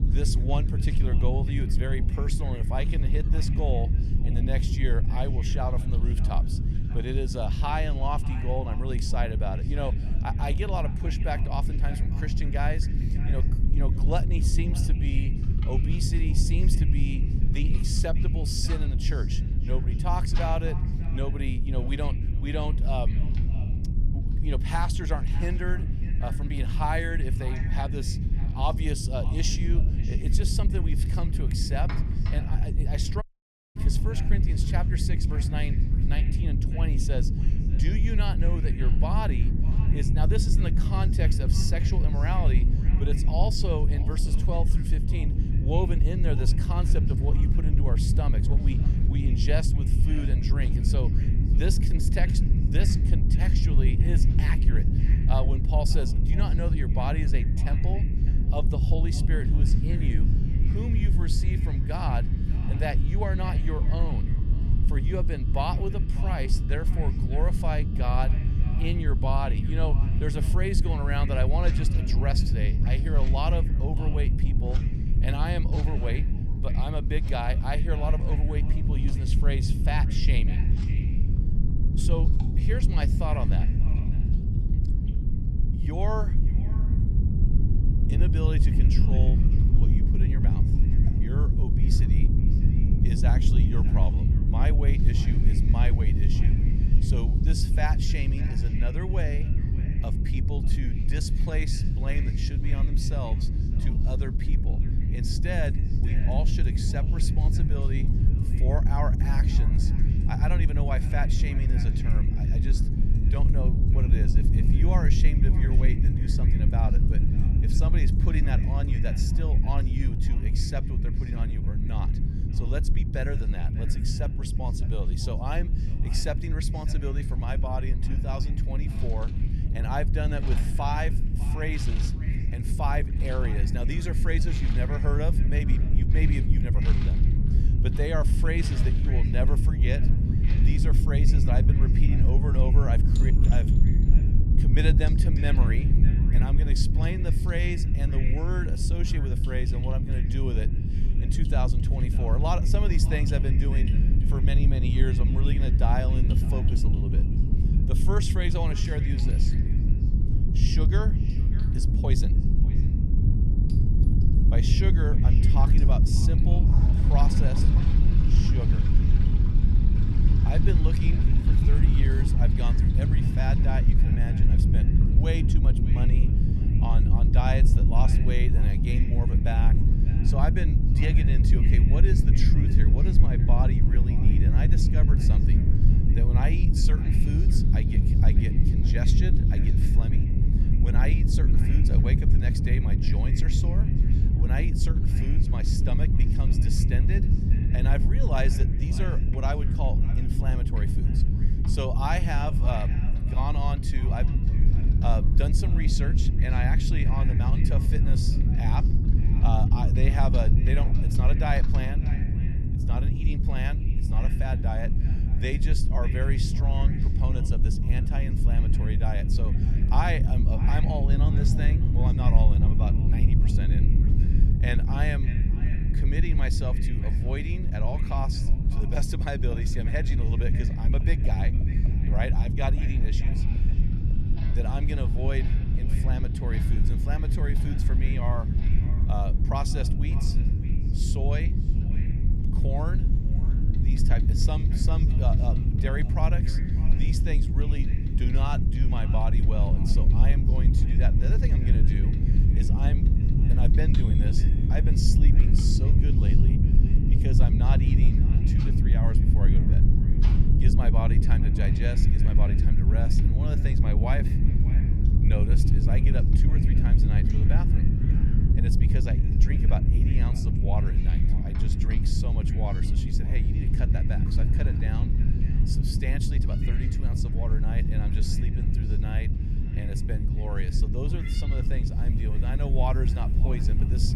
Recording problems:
echo of what is said; noticeable; throughout; 600 ms later, 15 dB below the speech
low rumble; loud; throughout; 3 dB below the speech
household noises; noticeable; throughout; 20 dB below the speech
animal sounds; faint; throughout; 25 dB below the speech
audio cutting out; at 33 s for 0.5 s

